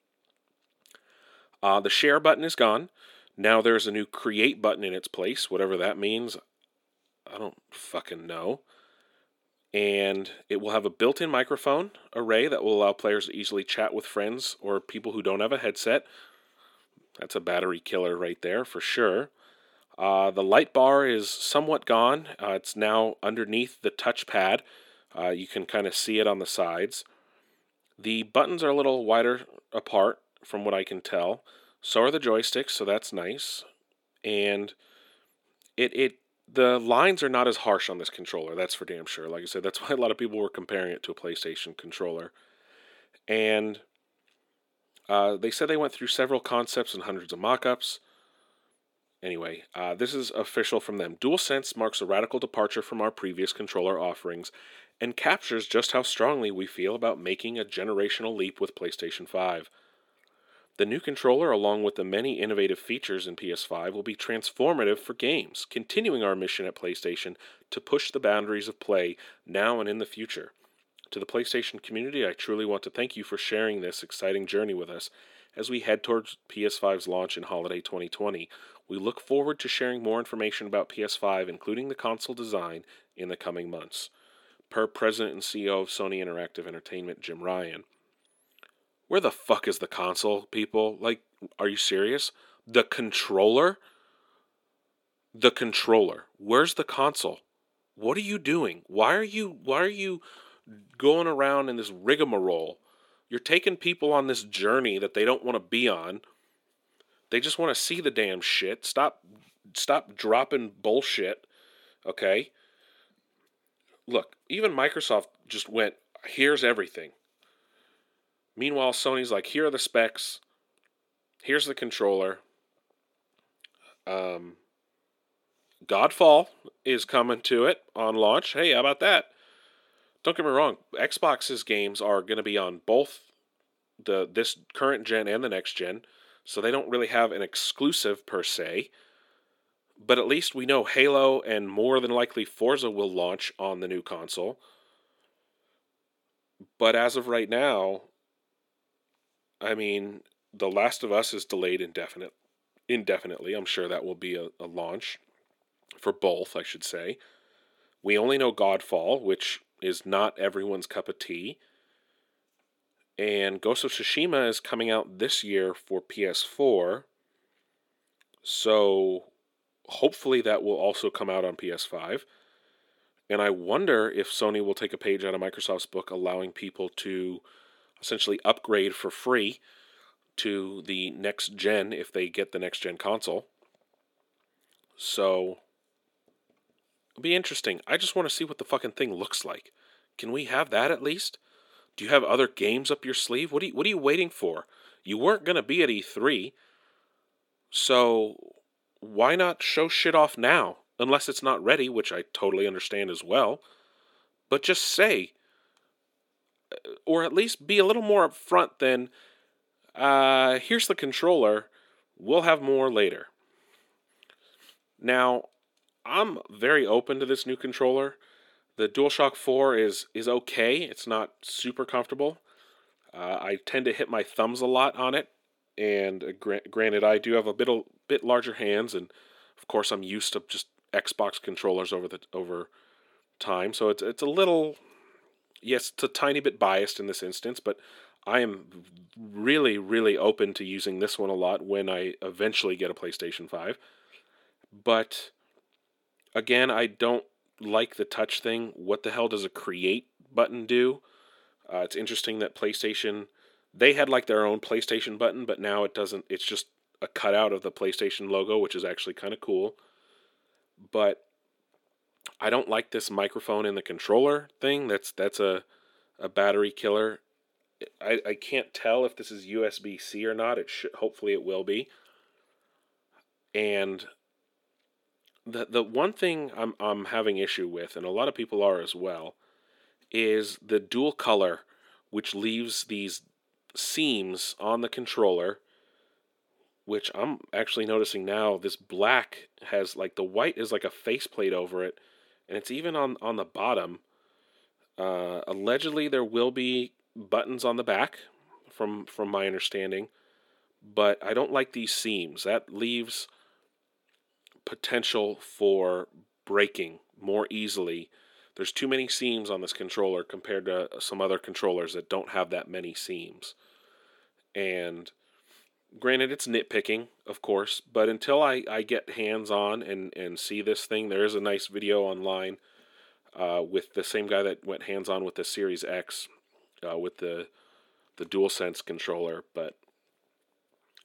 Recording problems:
thin; somewhat; fading below 300 Hz

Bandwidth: 17 kHz